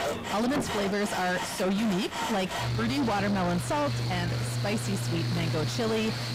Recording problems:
distortion; heavy; 5 dB below the speech
machinery noise; loud; throughout; 3 dB below the speech
chatter from many people; noticeable; throughout; 10 dB below the speech

